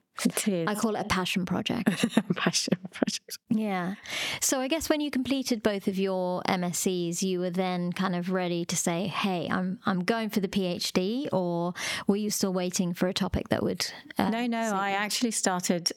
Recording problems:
squashed, flat; heavily

